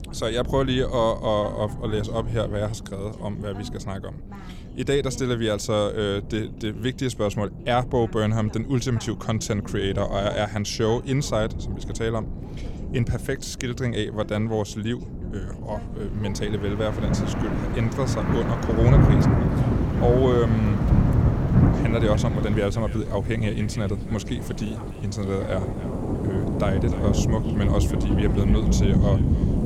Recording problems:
echo of what is said; faint; from 18 s on; 290 ms later, 20 dB below the speech
rain or running water; very loud; from 16 s on; 3 dB above the speech
voice in the background; noticeable; throughout; 20 dB below the speech
wind noise on the microphone; occasional gusts; 15 dB below the speech

